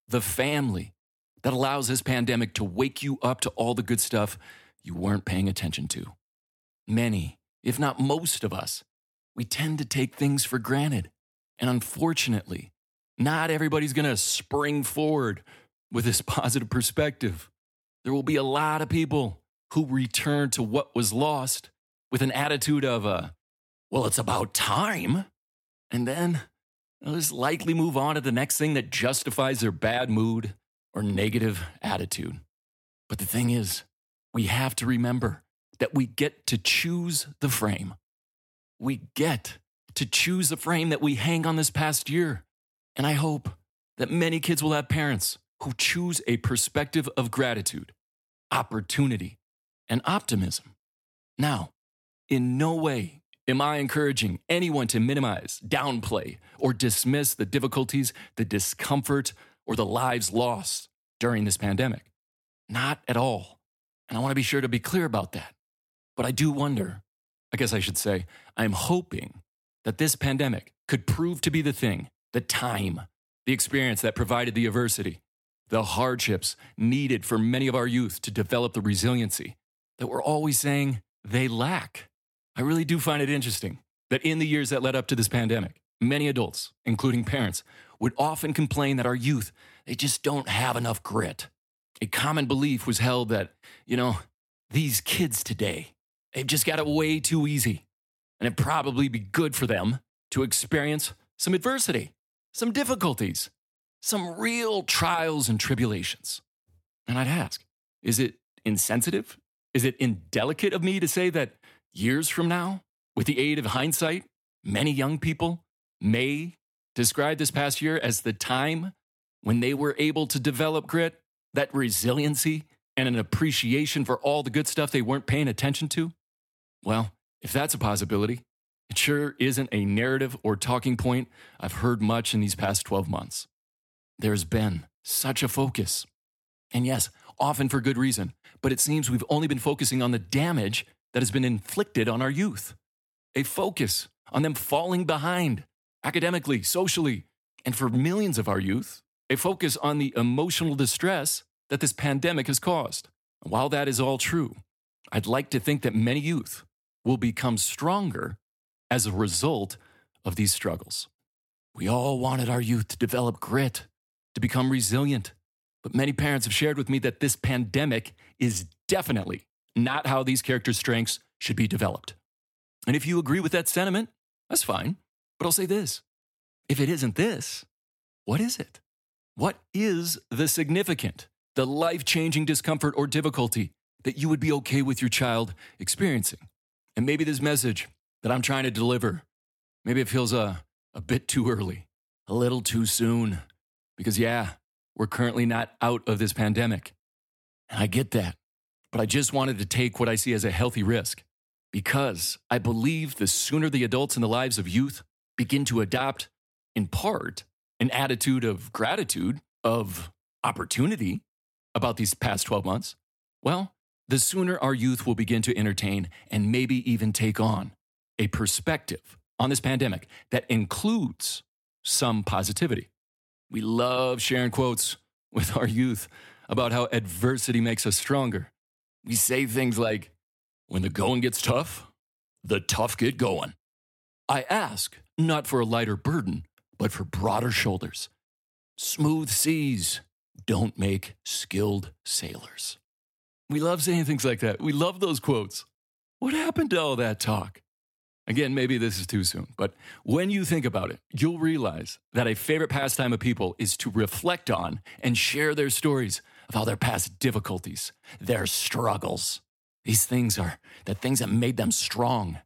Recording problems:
none

